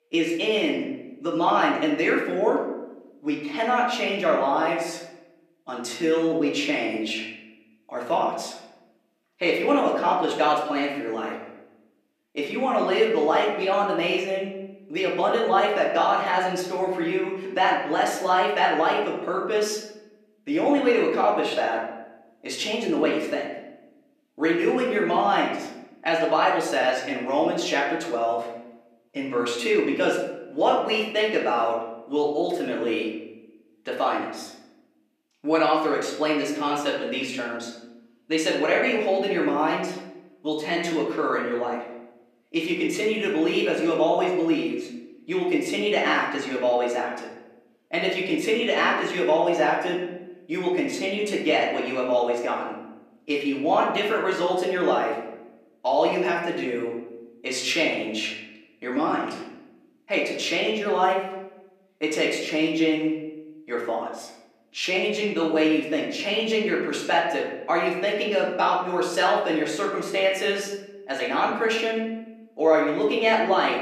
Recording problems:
off-mic speech; far
room echo; noticeable; dies away in 0.8 s
thin; very slightly; fading below 300 Hz

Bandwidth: 14.5 kHz